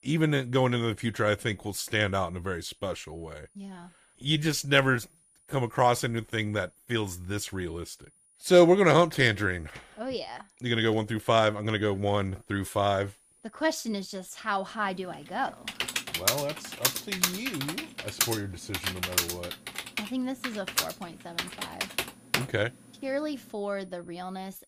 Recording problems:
high-pitched whine; faint; throughout; 9.5 kHz, 35 dB below the speech
keyboard typing; loud; from 16 to 22 s; peak 1 dB above the speech

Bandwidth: 15 kHz